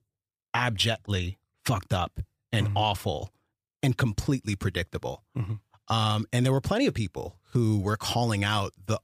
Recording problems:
none

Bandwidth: 15 kHz